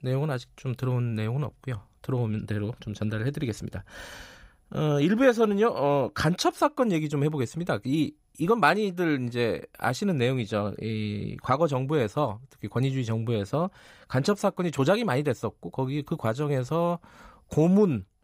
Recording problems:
none

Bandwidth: 15.5 kHz